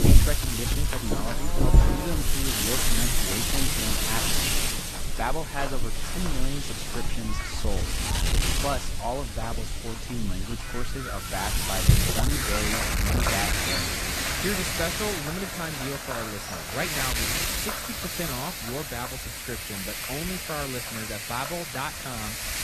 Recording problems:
garbled, watery; slightly; nothing above 14 kHz
animal sounds; very loud; throughout; 3 dB above the speech
wind noise on the microphone; heavy; 6 dB above the speech

